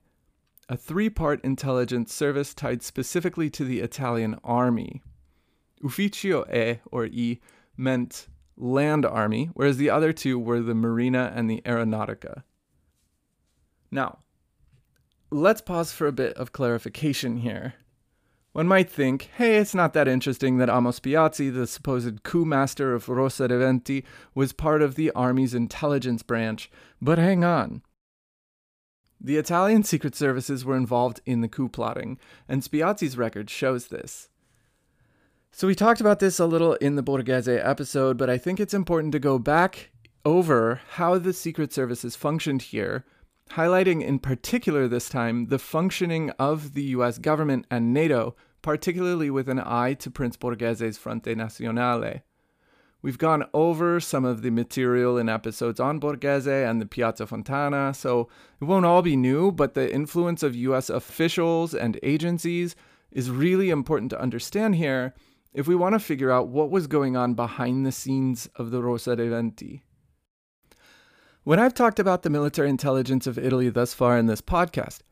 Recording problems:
none

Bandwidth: 15 kHz